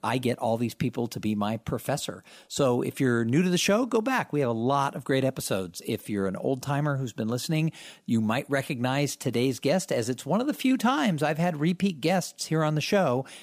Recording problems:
none

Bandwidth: 15 kHz